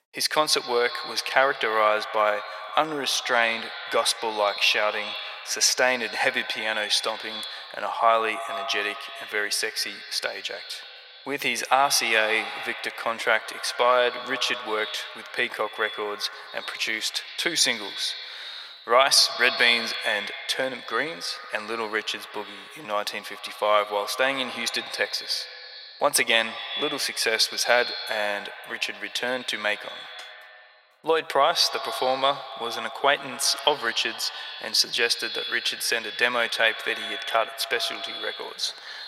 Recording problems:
echo of what is said; strong; throughout; 120 ms later, 10 dB below the speech
thin; very; fading below 750 Hz

